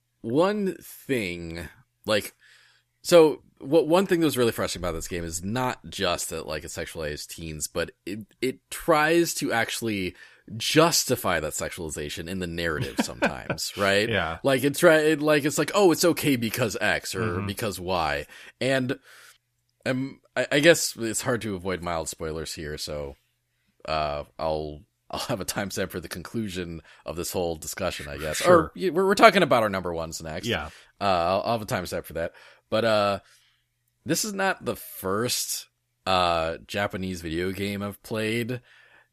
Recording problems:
none

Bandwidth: 14.5 kHz